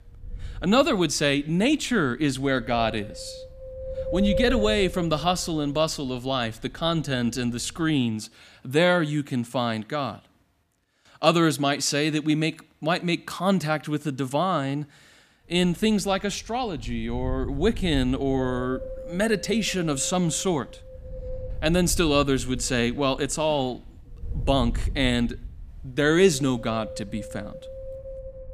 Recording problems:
wind noise on the microphone; occasional gusts; until 8 s and from 15 s on; 10 dB below the speech

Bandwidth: 15 kHz